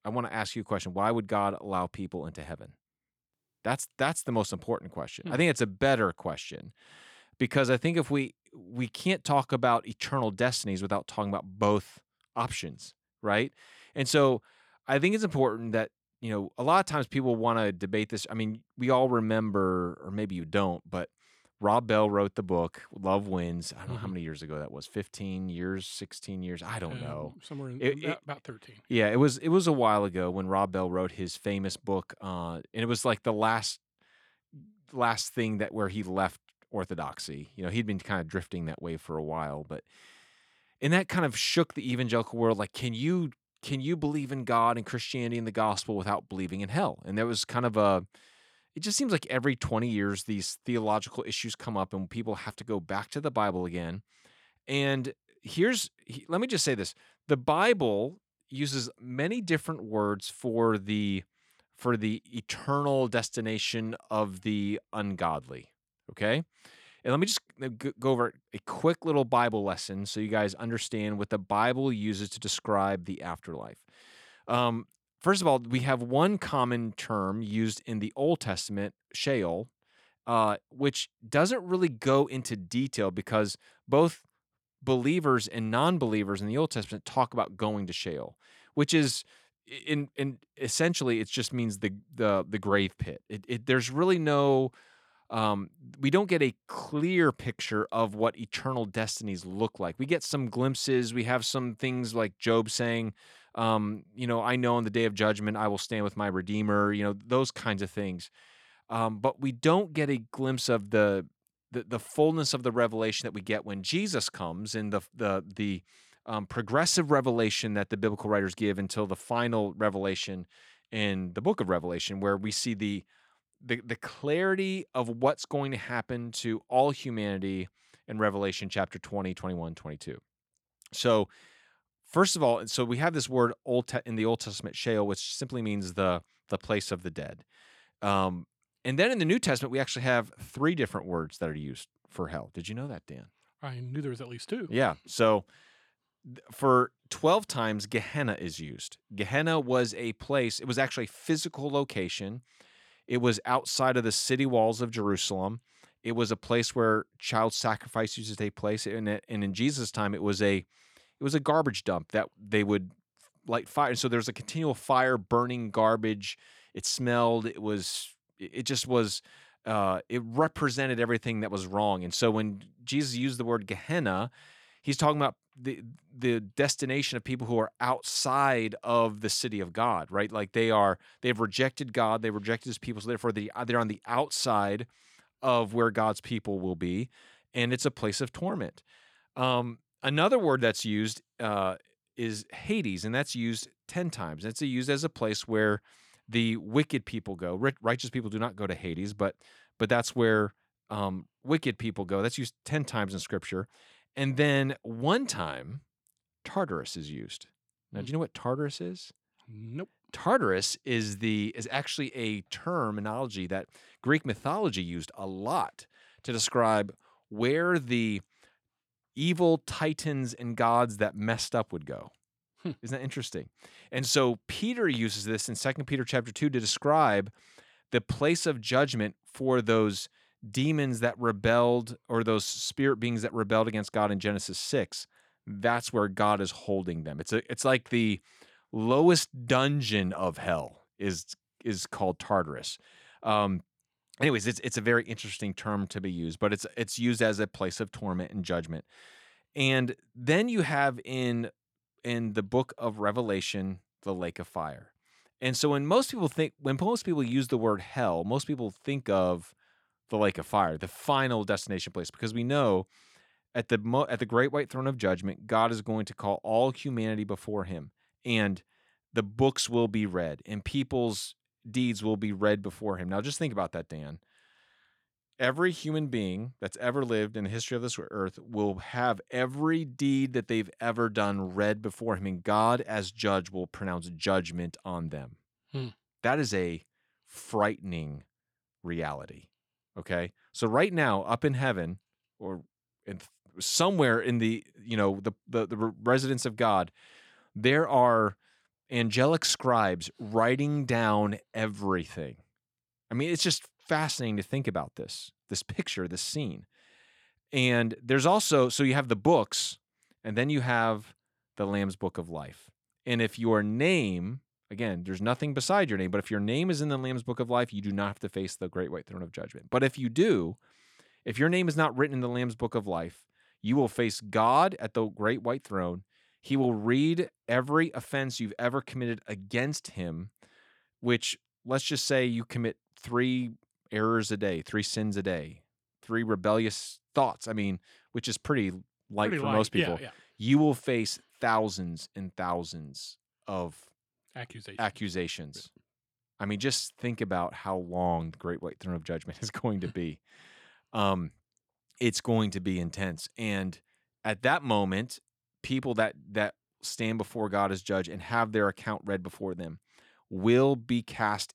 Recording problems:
none

